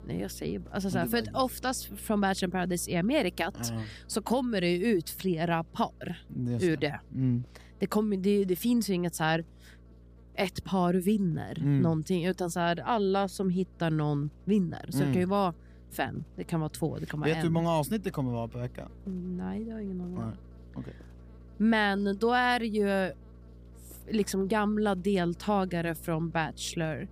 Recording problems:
electrical hum; faint; throughout; 60 Hz, 30 dB below the speech

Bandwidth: 15 kHz